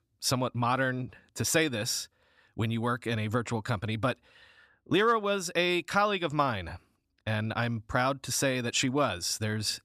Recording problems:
none

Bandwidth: 14.5 kHz